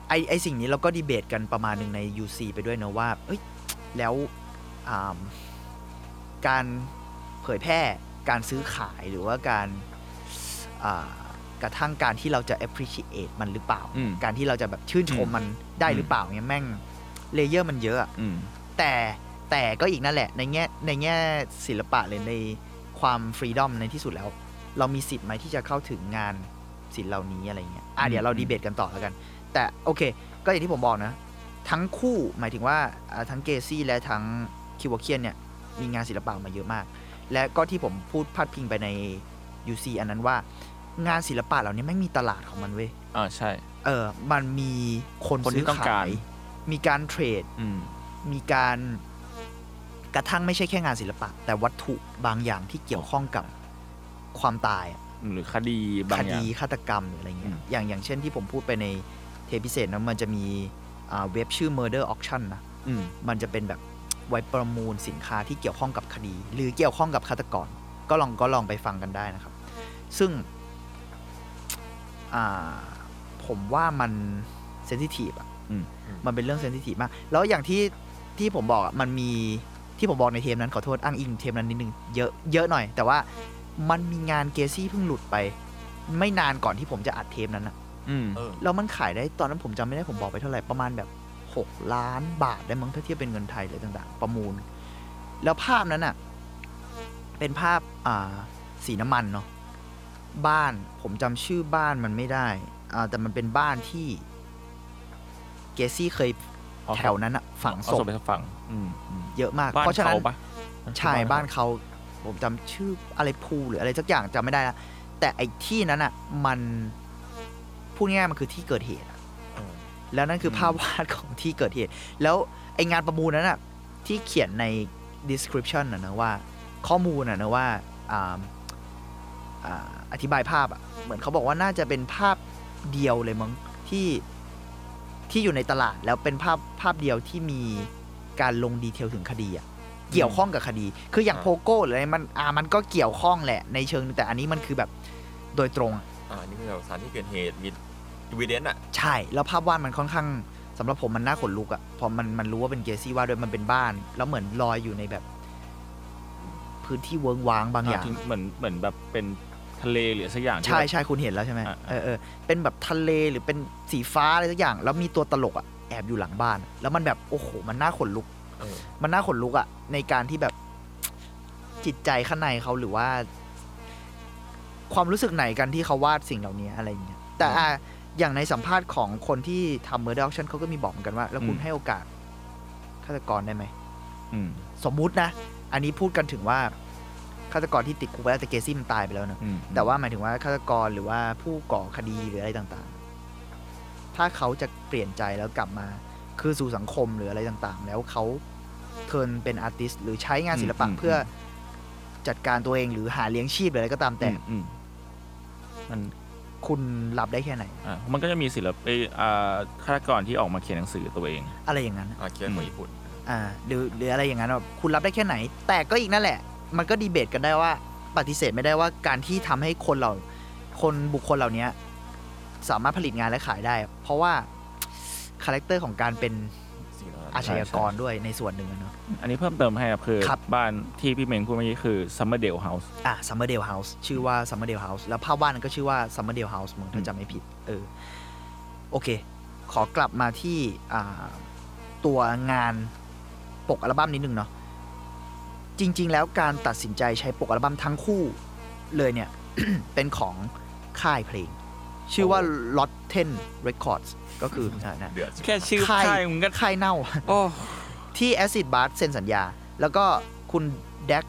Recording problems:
electrical hum; noticeable; throughout; 60 Hz, 20 dB below the speech

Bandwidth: 17.5 kHz